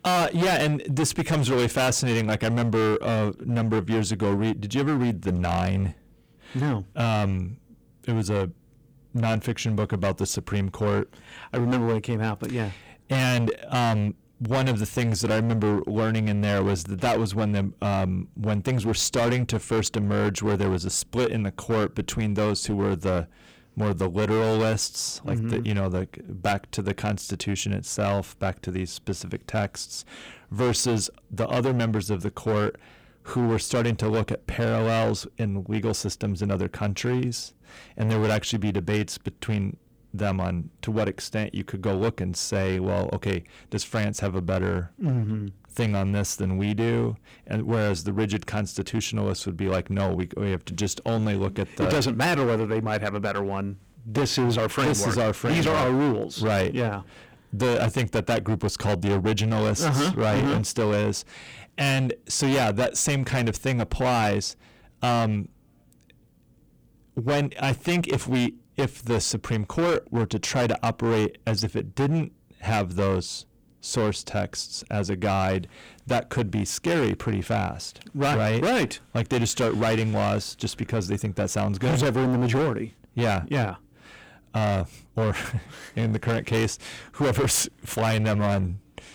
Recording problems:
distortion; heavy; 16% of the sound clipped

